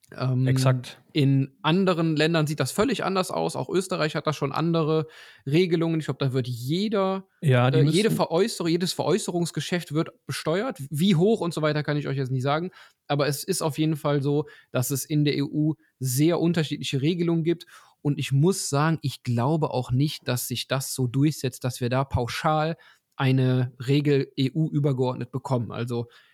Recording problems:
none

